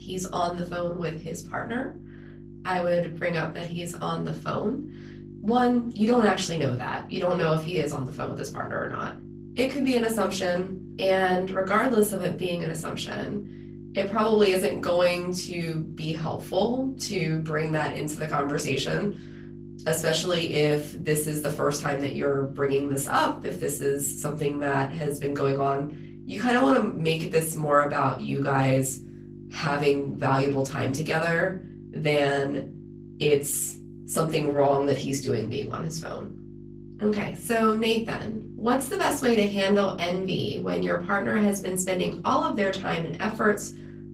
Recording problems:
off-mic speech; far
room echo; very slight; dies away in 0.3 s
garbled, watery; slightly; nothing above 15.5 kHz
electrical hum; faint; throughout; 50 Hz, 20 dB below the speech

